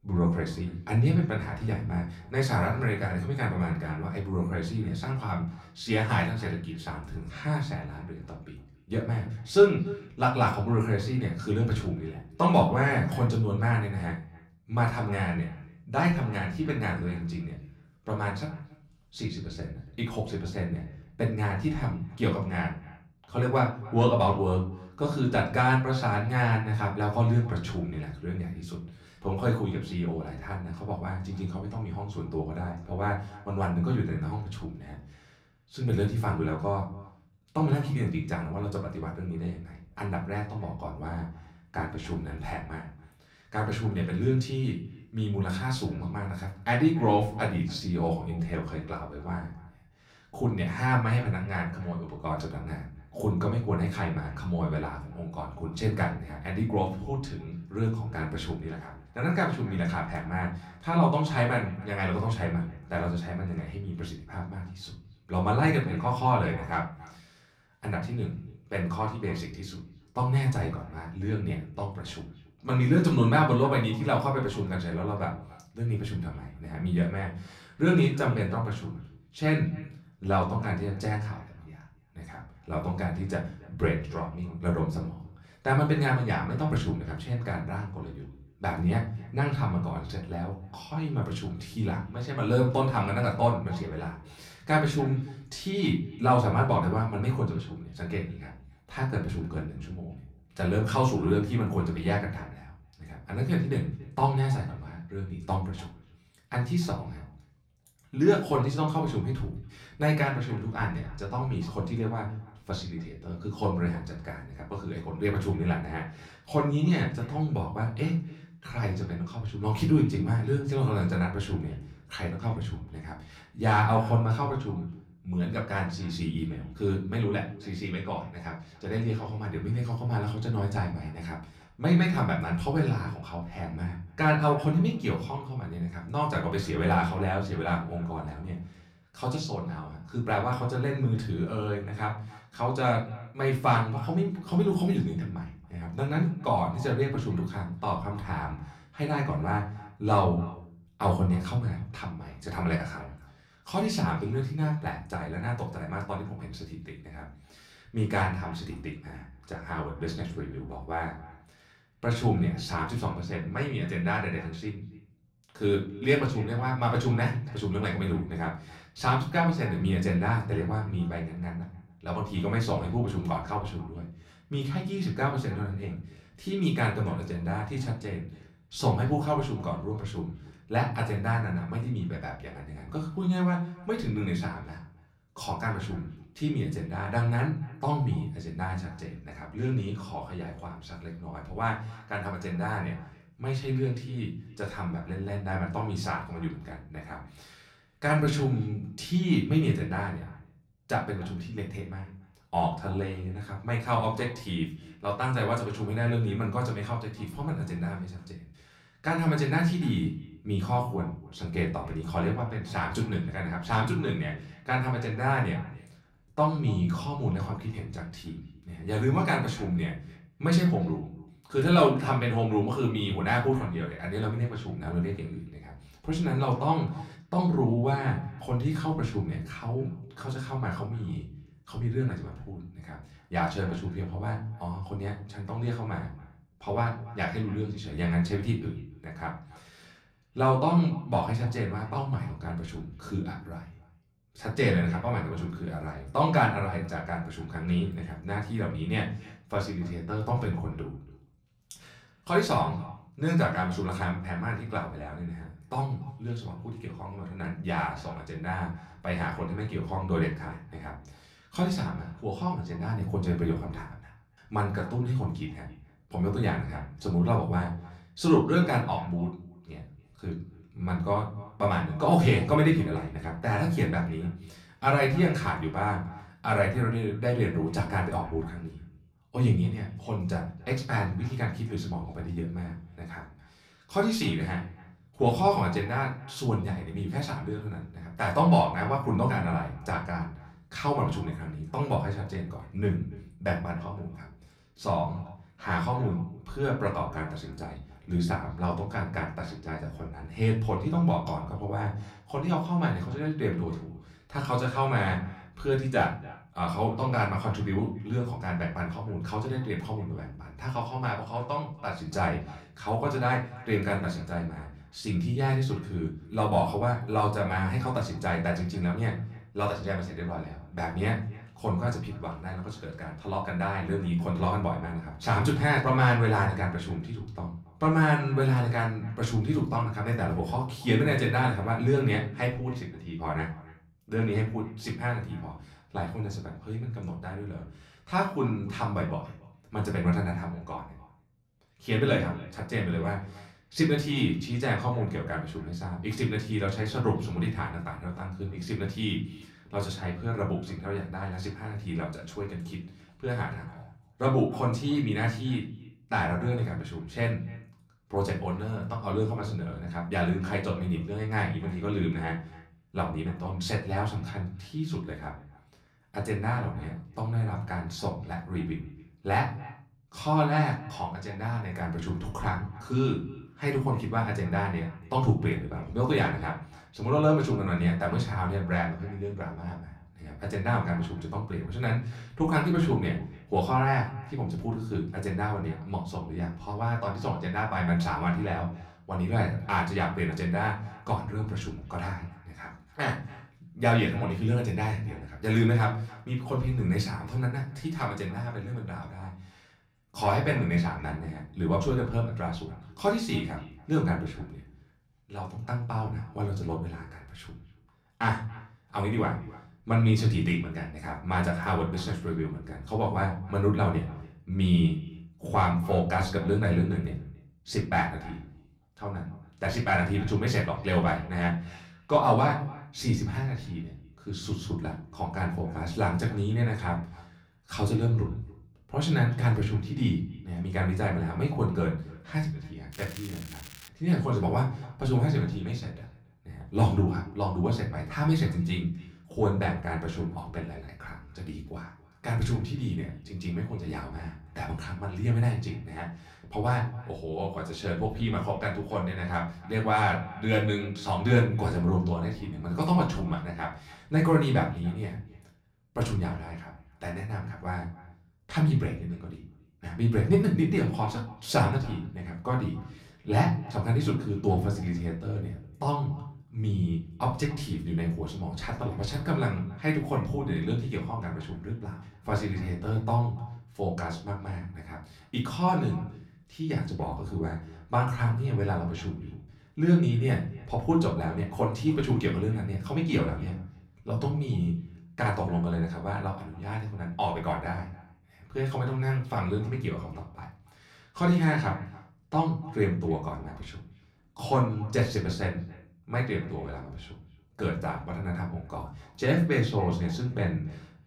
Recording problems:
off-mic speech; far
echo of what is said; faint; throughout; 280 ms later, 20 dB below the speech
room echo; slight; dies away in 0.4 s
crackling; noticeable; at 7:13; 15 dB below the speech

